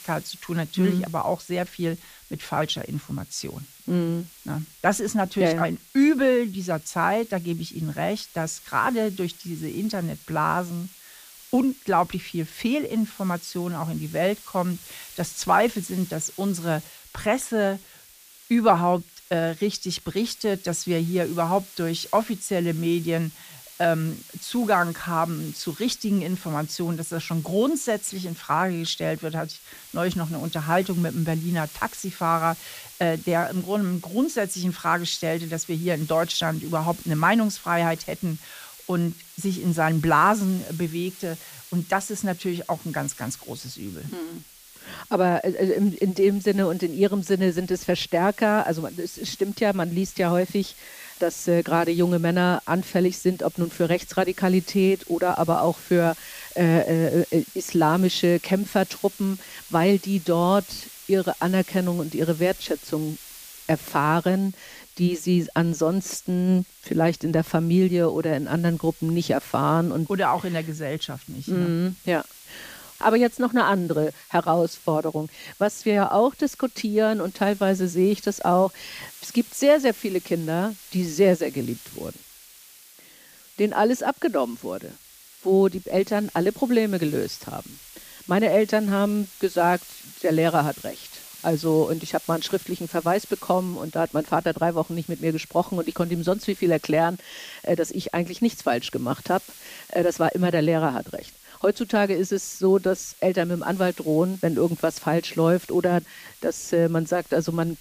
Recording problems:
hiss; noticeable; throughout; 20 dB below the speech

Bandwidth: 15 kHz